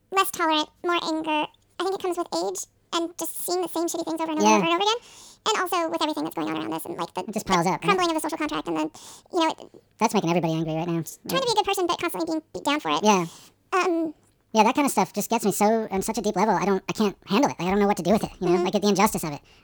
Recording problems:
wrong speed and pitch; too fast and too high; 1.7 times normal speed

